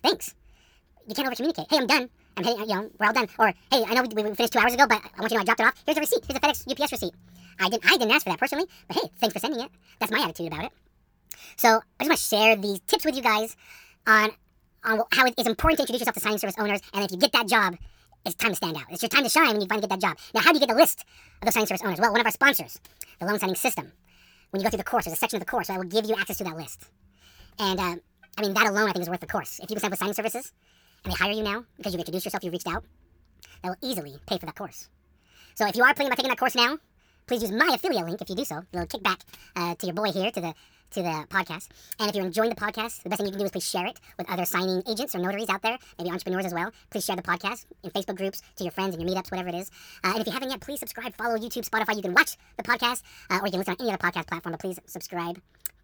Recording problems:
wrong speed and pitch; too fast and too high; 1.6 times normal speed

